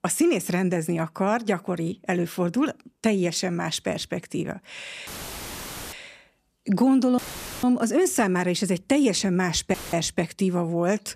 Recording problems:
audio cutting out; filled with static; at 5 s for 1 s, at 7 s and at 9.5 s

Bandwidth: 14.5 kHz